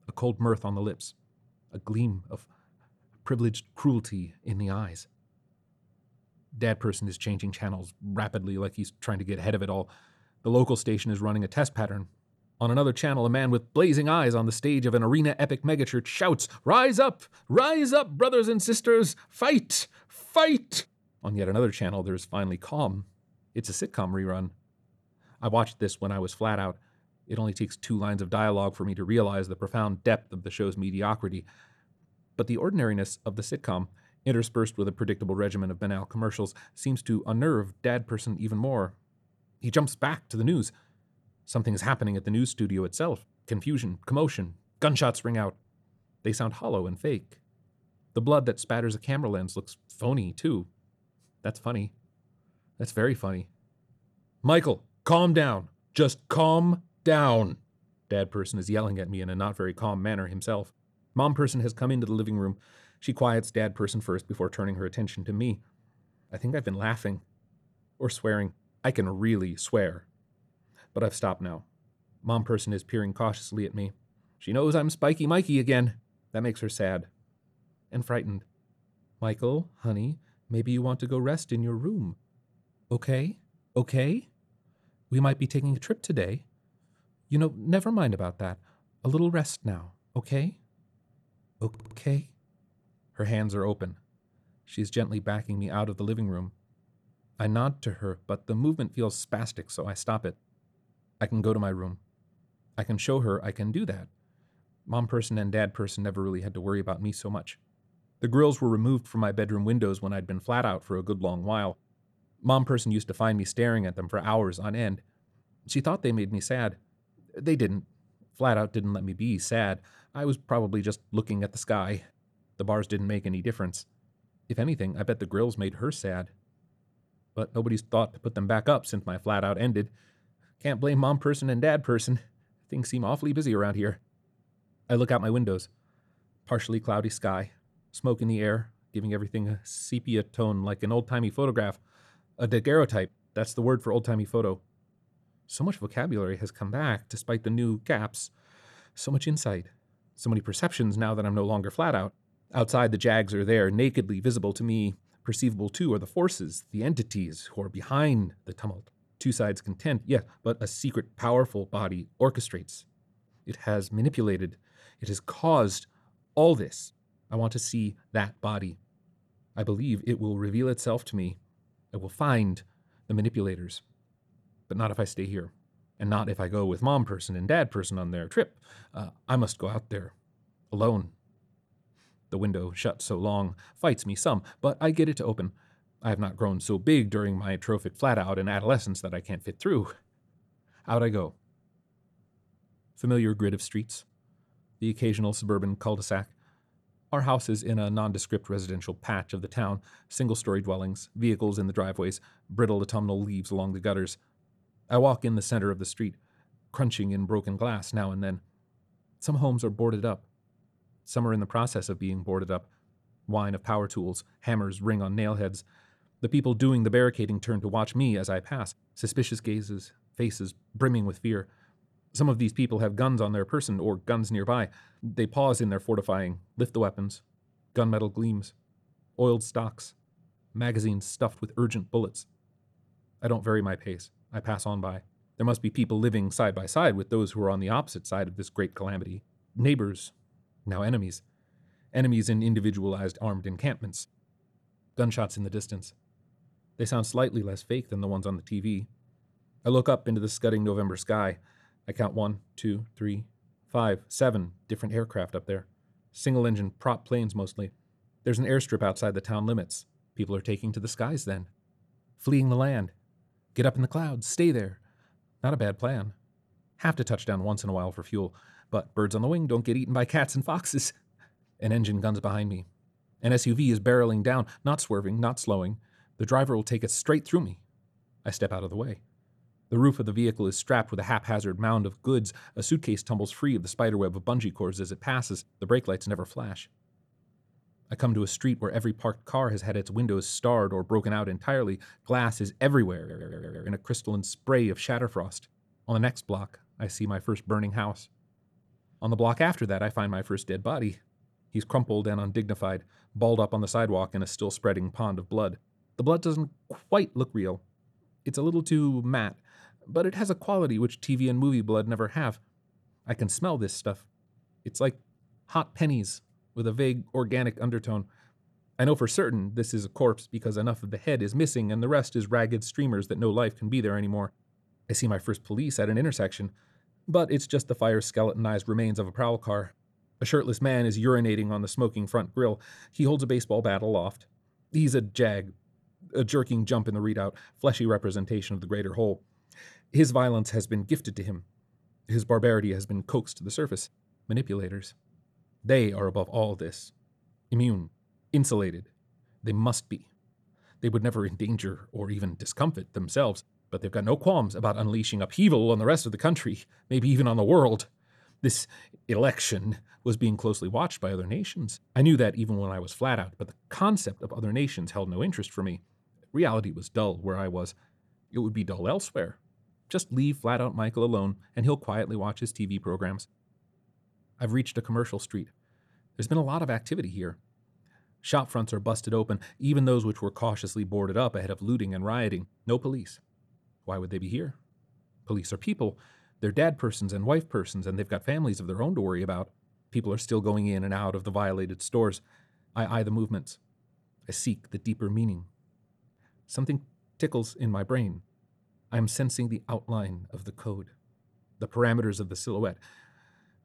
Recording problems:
audio stuttering; at 1:32 and at 4:53

